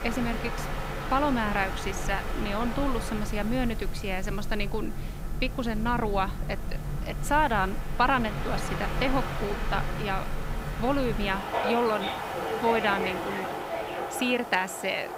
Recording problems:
train or aircraft noise; loud; throughout; 4 dB below the speech
hiss; faint; throughout; 20 dB below the speech

